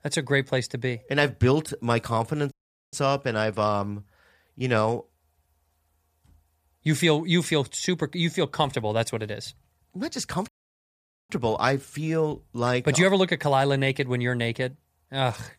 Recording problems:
audio cutting out; at 2.5 s and at 10 s for 1 s

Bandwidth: 14.5 kHz